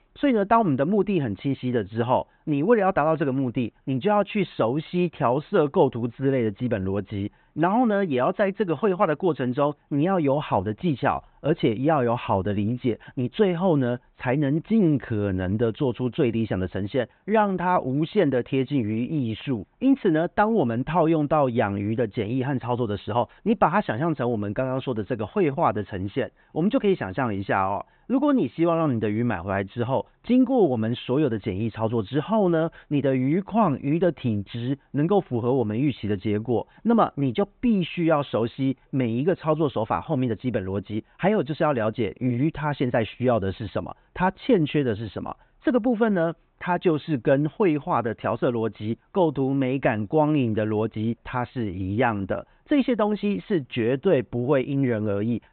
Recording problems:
high frequencies cut off; severe; nothing above 4 kHz

